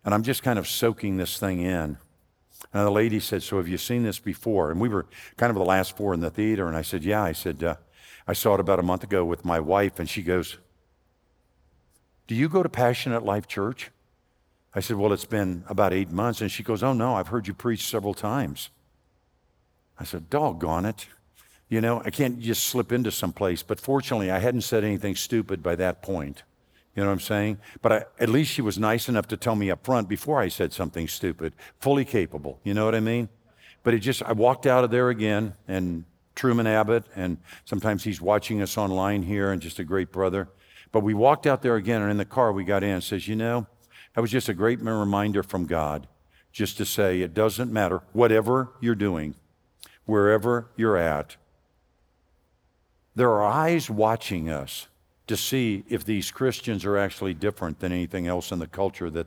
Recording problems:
none

